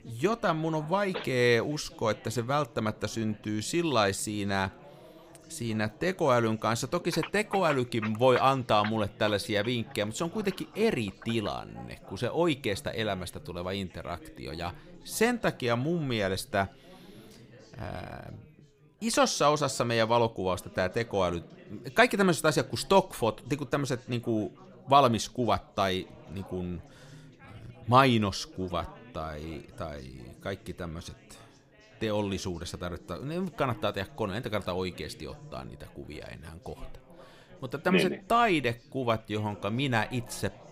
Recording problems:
background chatter; faint; throughout; 4 voices, 25 dB below the speech

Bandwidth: 15.5 kHz